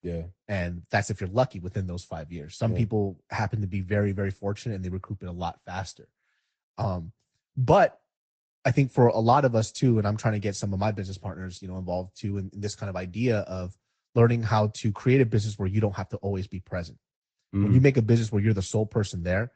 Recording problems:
high frequencies cut off; noticeable; nothing above 8 kHz
garbled, watery; slightly

